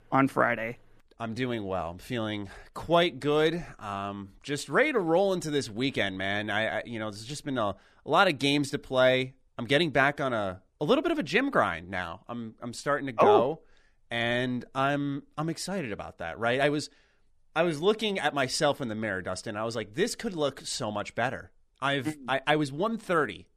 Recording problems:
none

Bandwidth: 14 kHz